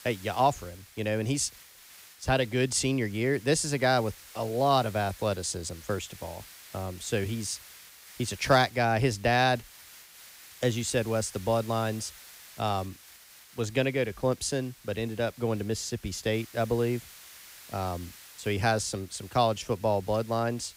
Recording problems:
hiss; noticeable; throughout; 20 dB below the speech

